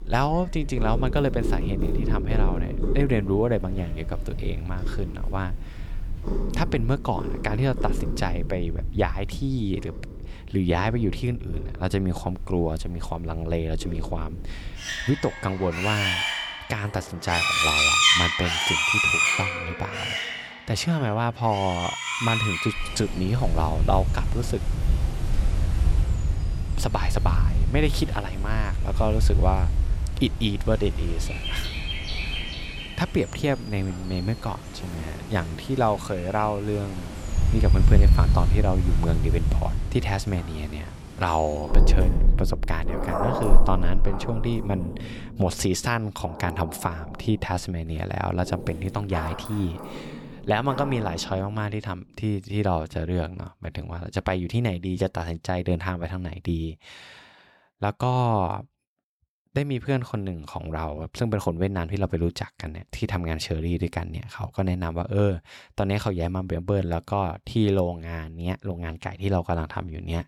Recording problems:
animal sounds; very loud; until 51 s; 1 dB above the speech

